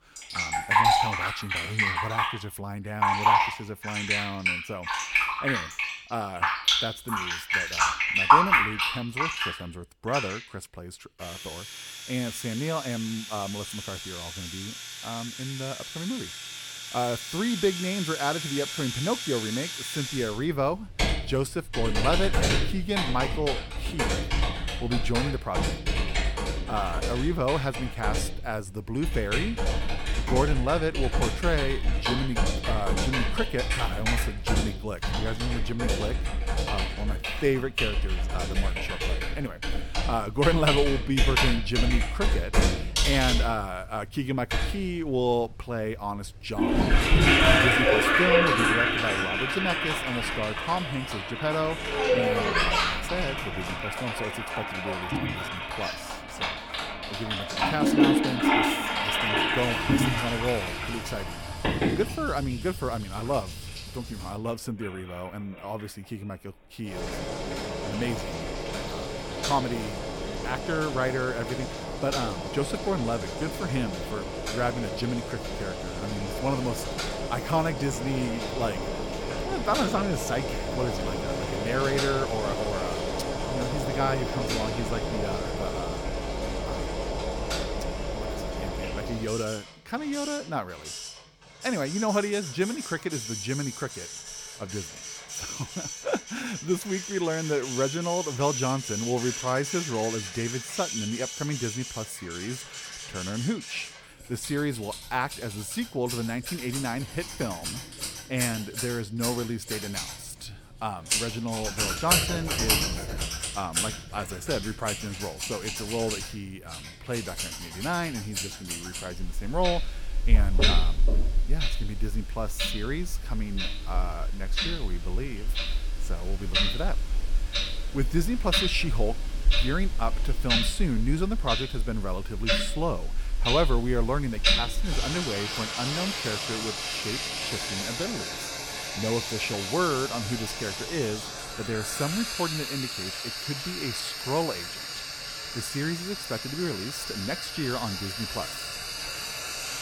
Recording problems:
household noises; very loud; throughout; 3 dB above the speech

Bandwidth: 17.5 kHz